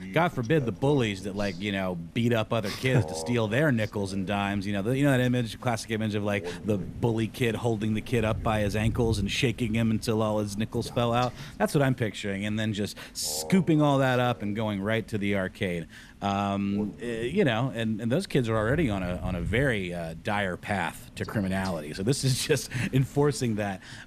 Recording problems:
animal sounds; noticeable; throughout; 15 dB below the speech

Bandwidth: 14.5 kHz